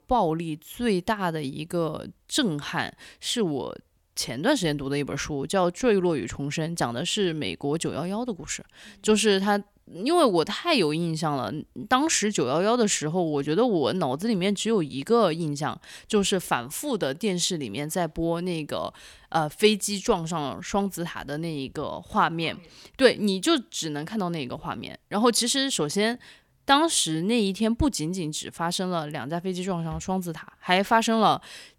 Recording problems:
none

